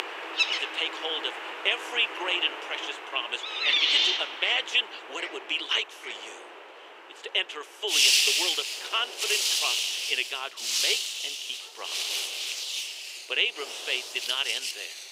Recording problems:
thin; very; fading below 350 Hz
animal sounds; very loud; throughout; 2 dB above the speech
wind noise on the microphone; occasional gusts; 20 dB below the speech

